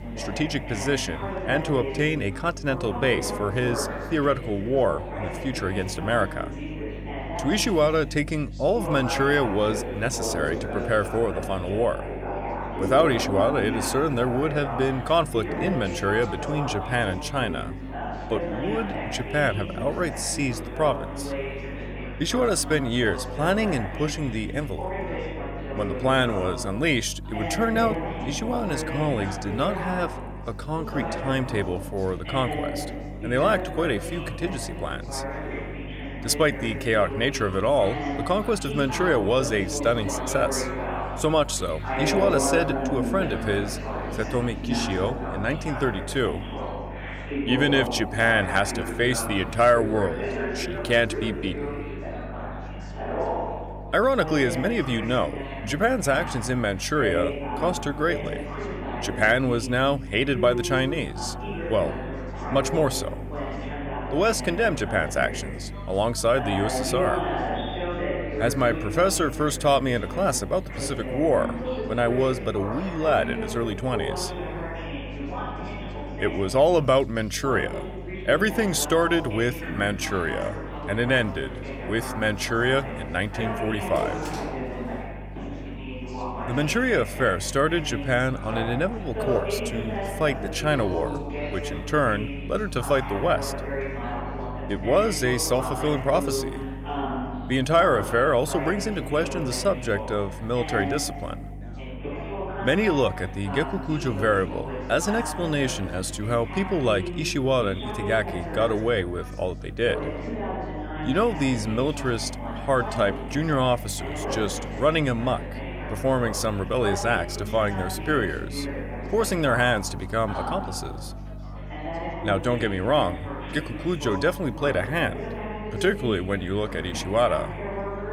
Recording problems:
background chatter; loud; throughout; 4 voices, 8 dB below the speech
electrical hum; faint; throughout; 50 Hz, 25 dB below the speech
door banging; faint; from 1:21 to 1:27; peak 15 dB below the speech

